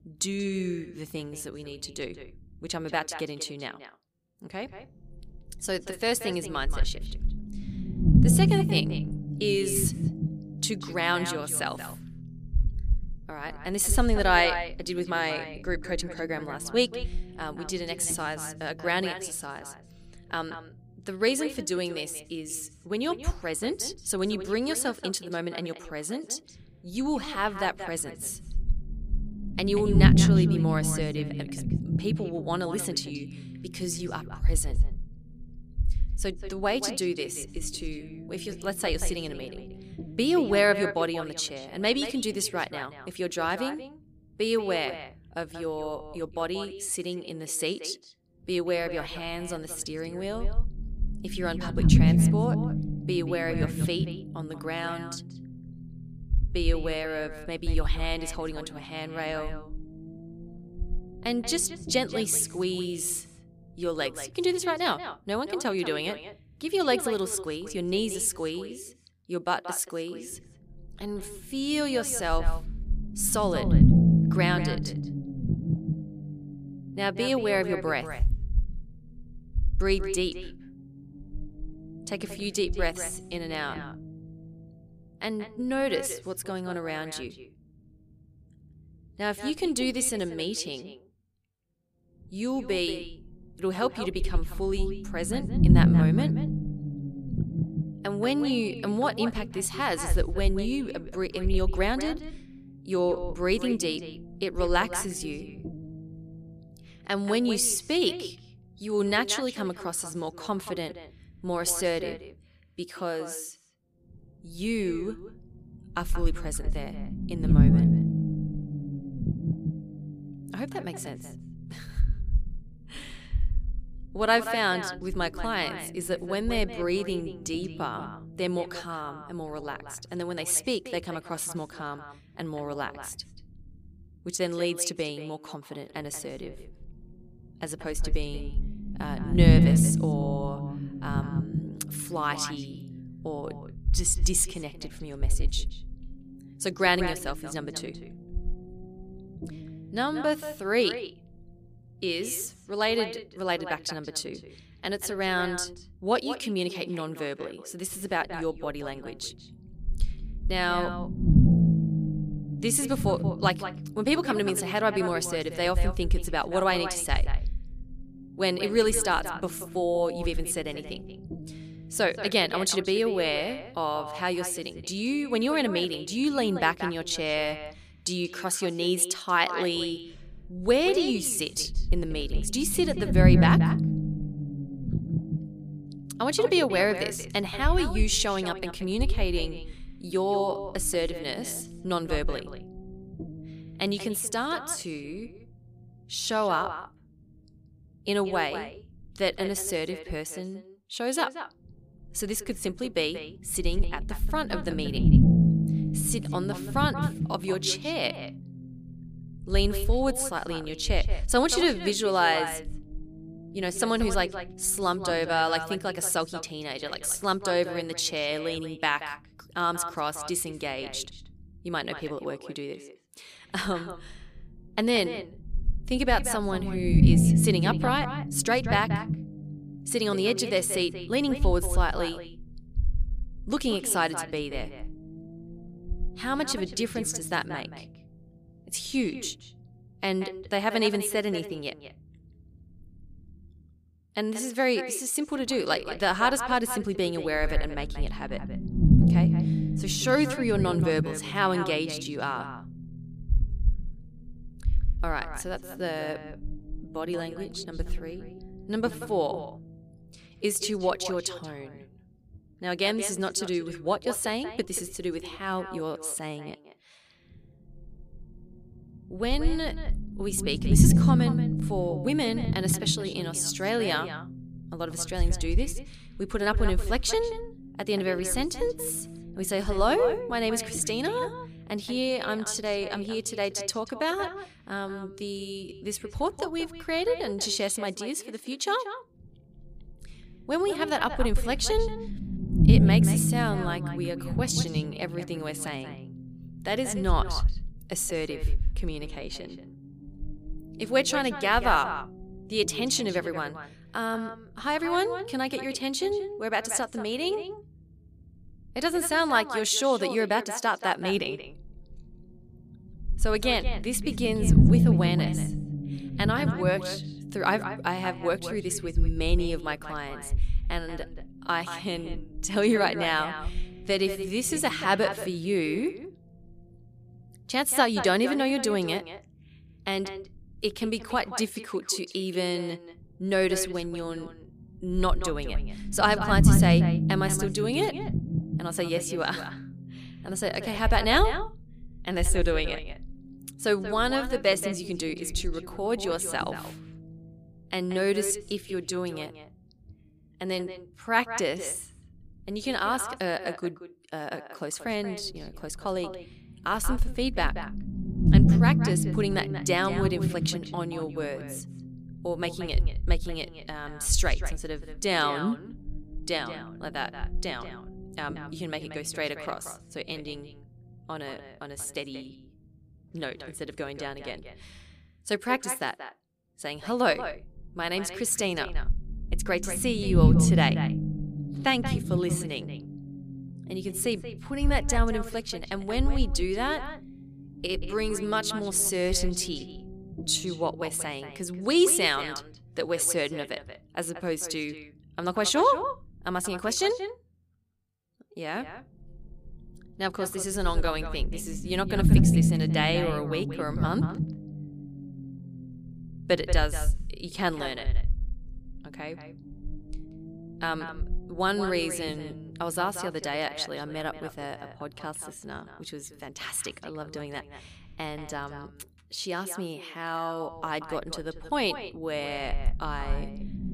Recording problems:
echo of what is said; noticeable; throughout; 180 ms later, 10 dB below the speech
low rumble; loud; throughout; 9 dB below the speech

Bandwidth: 15 kHz